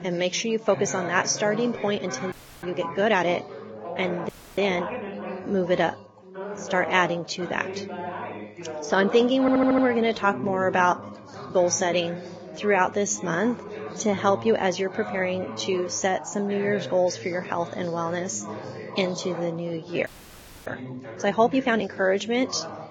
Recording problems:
garbled, watery; badly; nothing above 6 kHz
background chatter; noticeable; throughout; 4 voices, 10 dB below the speech
uneven, jittery; strongly; from 0.5 to 22 s
audio freezing; at 2.5 s, at 4.5 s and at 20 s for 0.5 s
audio stuttering; at 9.5 s

